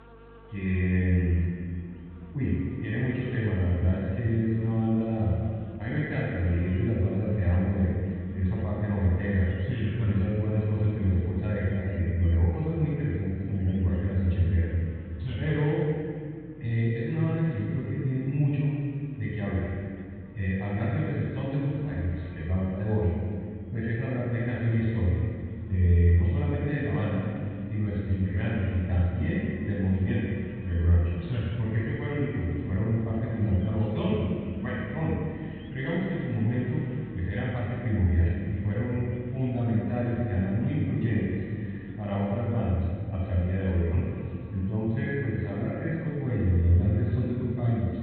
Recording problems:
room echo; strong; dies away in 2.2 s
off-mic speech; far
high frequencies cut off; severe; nothing above 4 kHz
electrical hum; noticeable; throughout; 50 Hz, 20 dB below the speech

